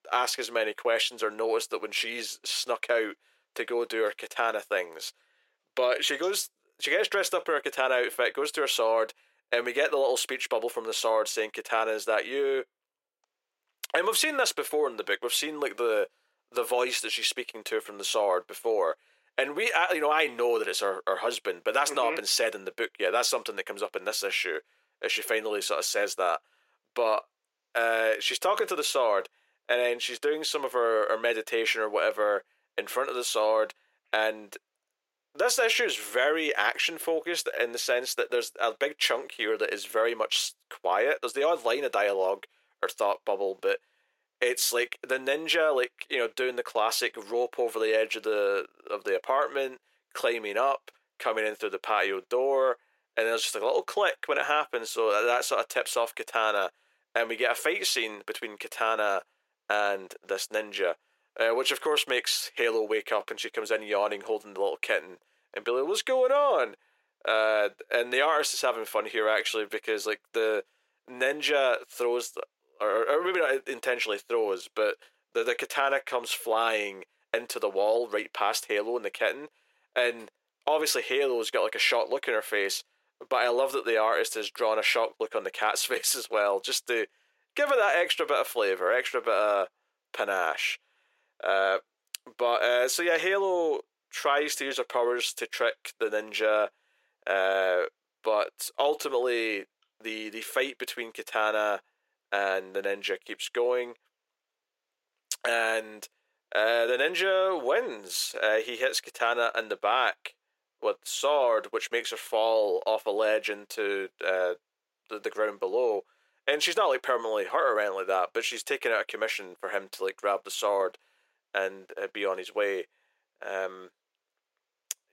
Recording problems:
thin; very; fading below 450 Hz

